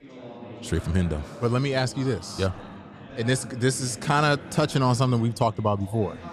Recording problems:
chatter from many people; noticeable; throughout; 15 dB below the speech

